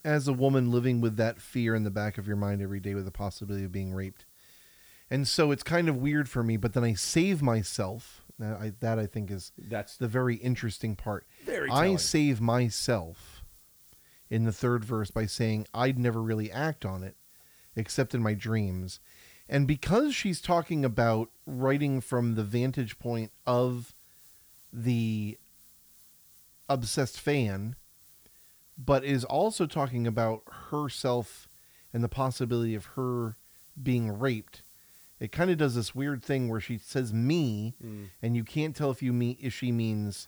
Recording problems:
hiss; faint; throughout; 25 dB below the speech

